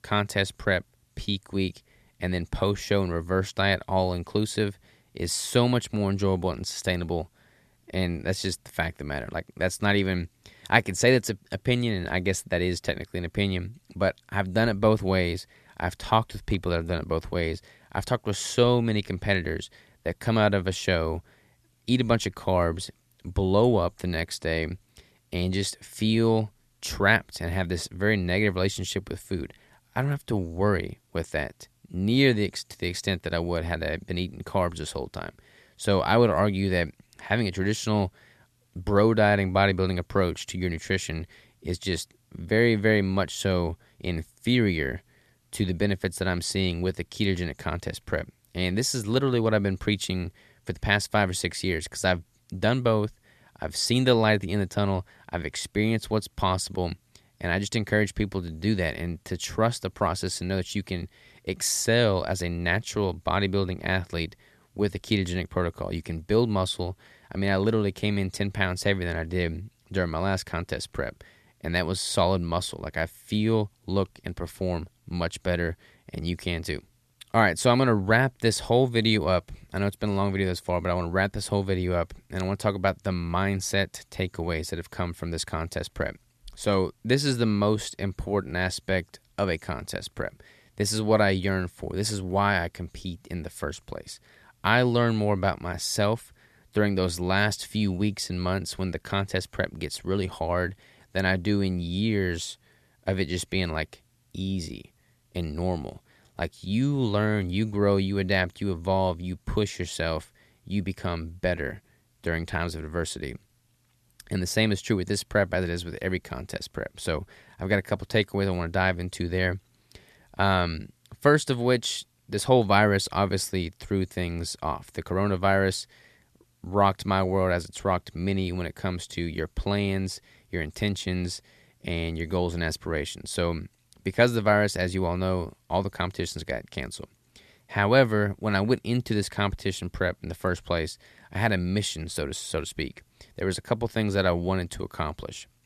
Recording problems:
none

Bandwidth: 13.5 kHz